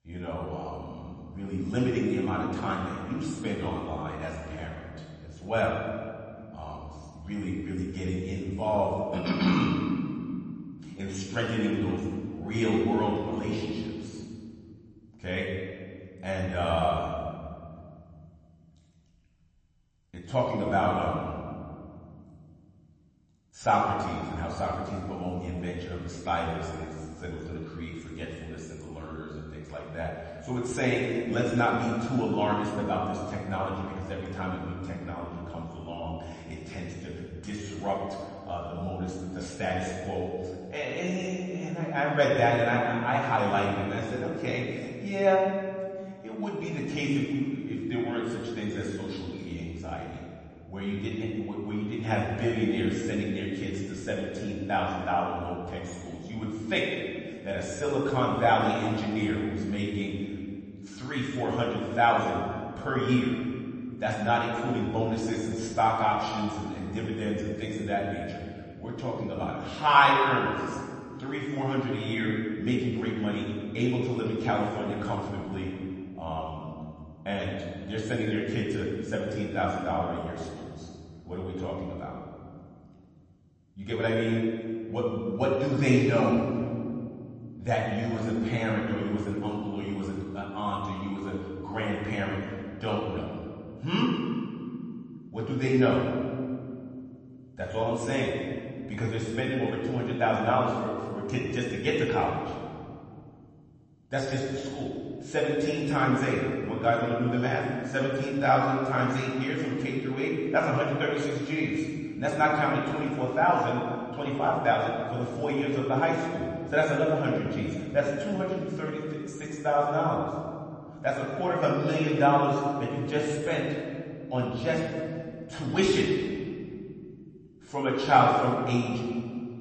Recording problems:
off-mic speech; far
room echo; noticeable; dies away in 2.1 s
garbled, watery; slightly; nothing above 8 kHz

